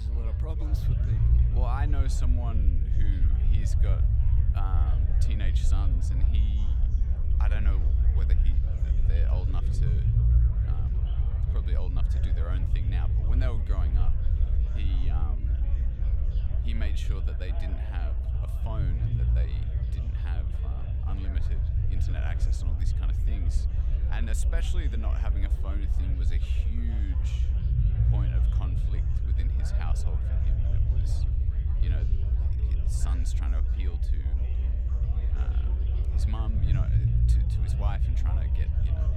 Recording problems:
chatter from many people; loud; throughout; 8 dB below the speech
low rumble; loud; throughout; as loud as the speech
abrupt cut into speech; at the start

